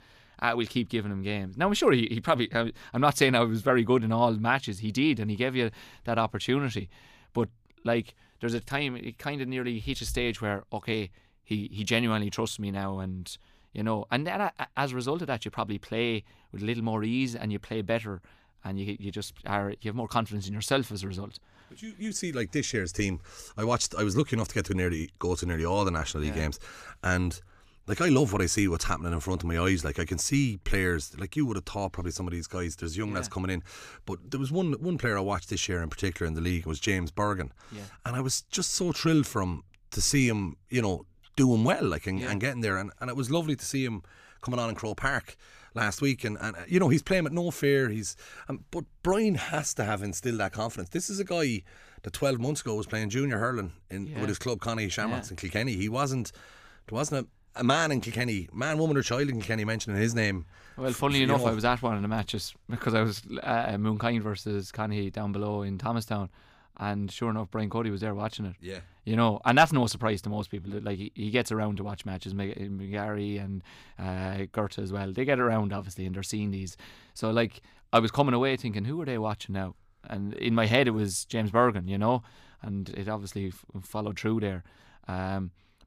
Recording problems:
none

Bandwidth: 15 kHz